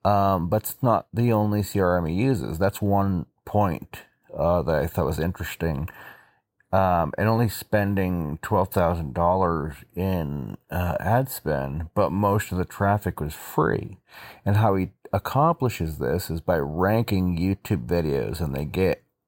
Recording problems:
none

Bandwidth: 16 kHz